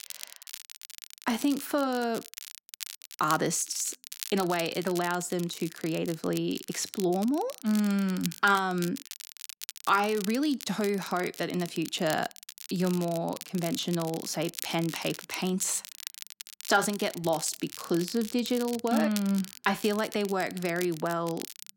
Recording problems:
crackle, like an old record; noticeable; 10 dB below the speech

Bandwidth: 16.5 kHz